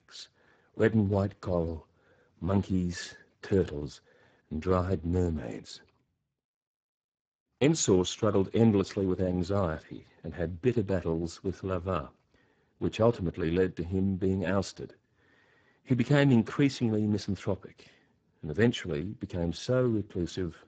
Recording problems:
garbled, watery; badly; nothing above 7.5 kHz

